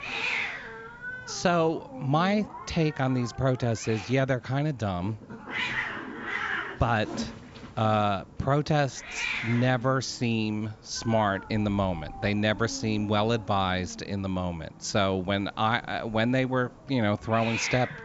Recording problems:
high frequencies cut off; noticeable; nothing above 8 kHz
hiss; loud; throughout; 8 dB below the speech

